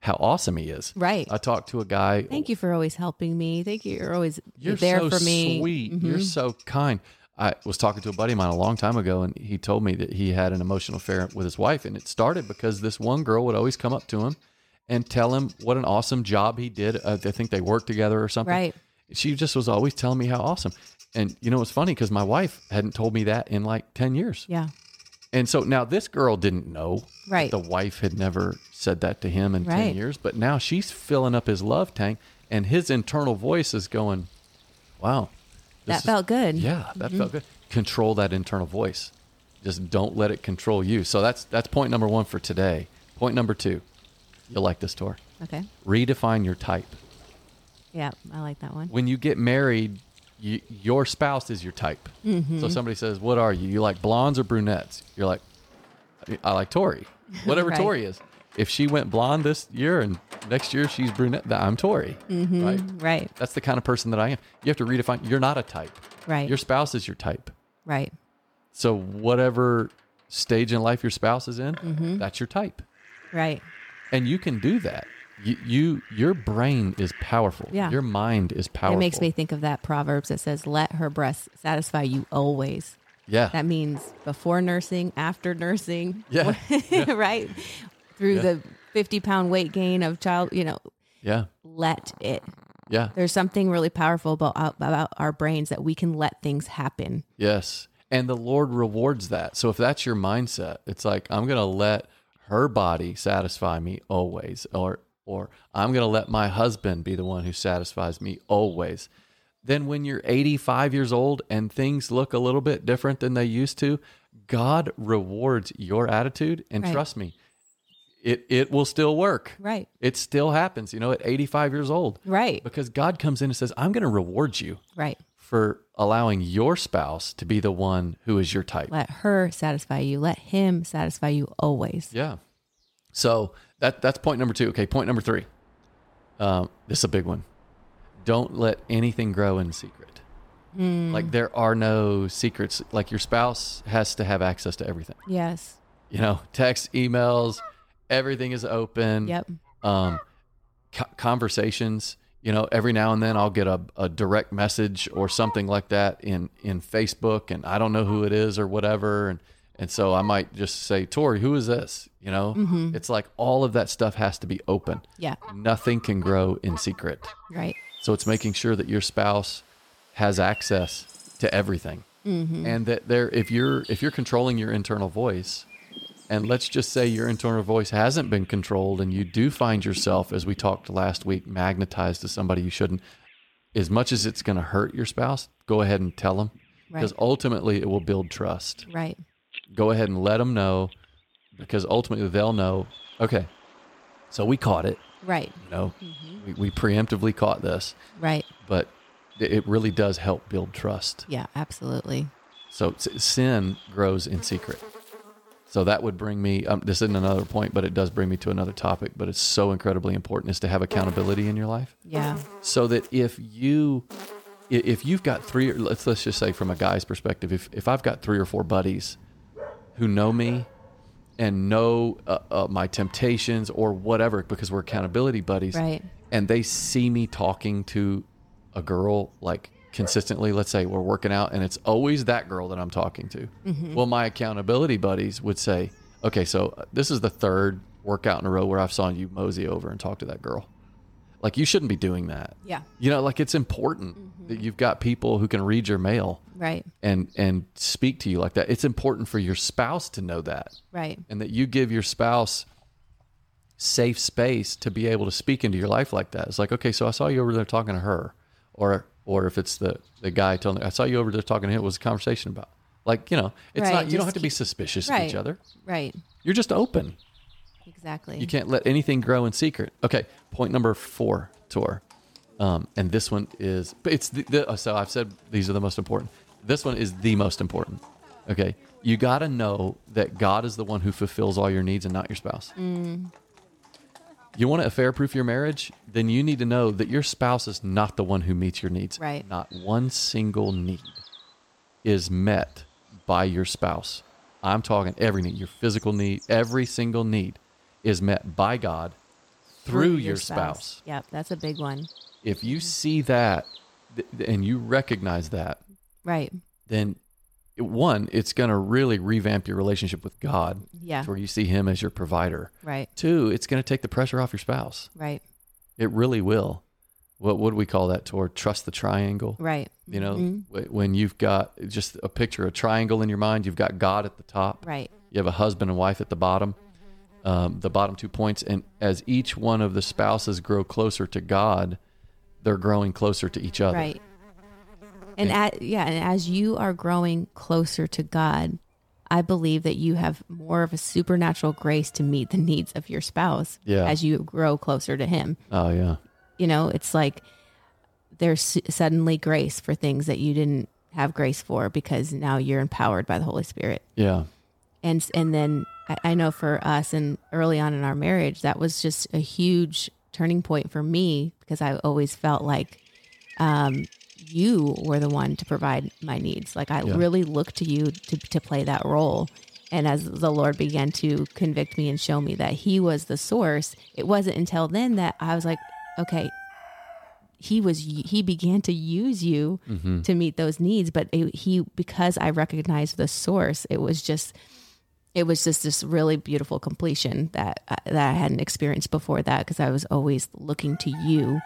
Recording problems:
animal sounds; faint; throughout; 25 dB below the speech

